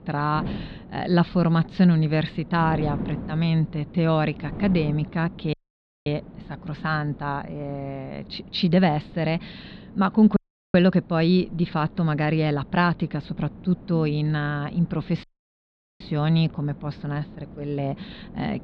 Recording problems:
muffled; very slightly; fading above 4 kHz
wind noise on the microphone; occasional gusts; 20 dB below the speech
audio cutting out; at 5.5 s for 0.5 s, at 10 s and at 15 s for 1 s

